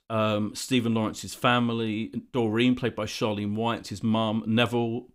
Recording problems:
none

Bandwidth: 15.5 kHz